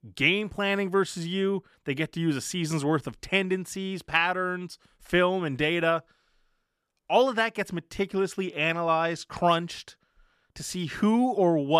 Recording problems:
abrupt cut into speech; at the end

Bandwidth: 14.5 kHz